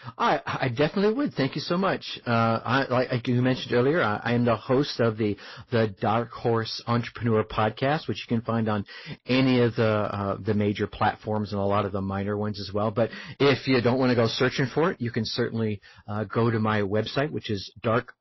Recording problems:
distortion; slight; 6% of the sound clipped
garbled, watery; slightly; nothing above 5.5 kHz

